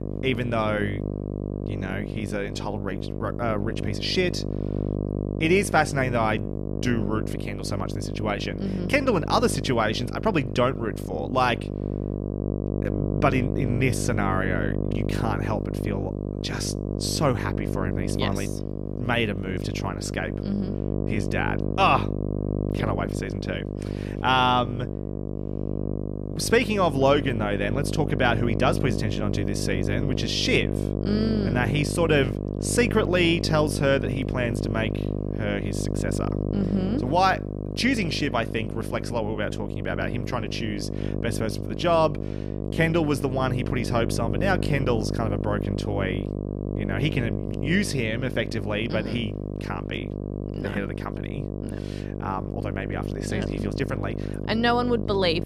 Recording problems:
electrical hum; loud; throughout; 50 Hz, 8 dB below the speech

